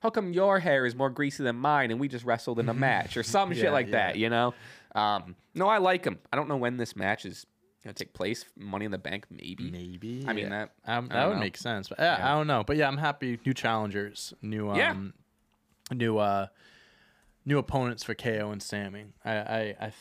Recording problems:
none

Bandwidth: 15 kHz